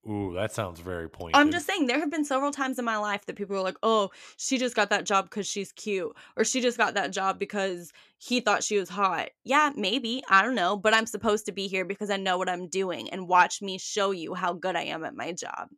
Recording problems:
none

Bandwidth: 14.5 kHz